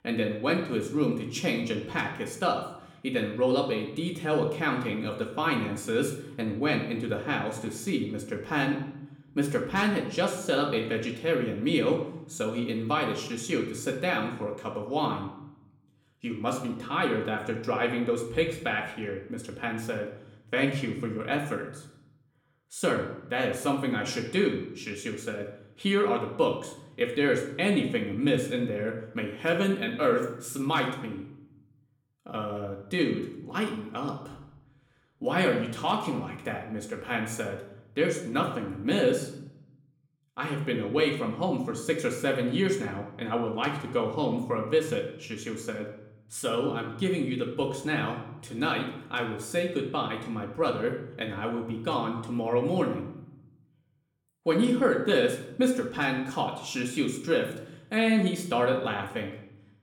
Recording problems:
room echo; slight; dies away in 0.7 s
off-mic speech; somewhat distant

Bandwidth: 17.5 kHz